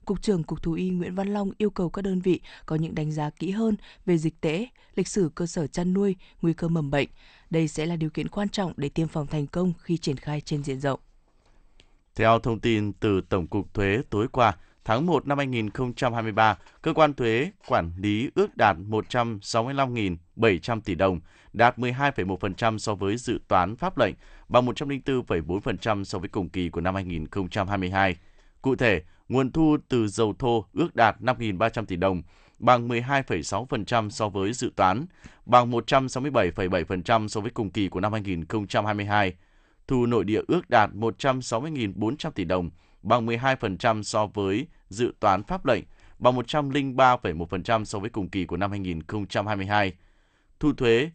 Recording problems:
garbled, watery; slightly; nothing above 8.5 kHz

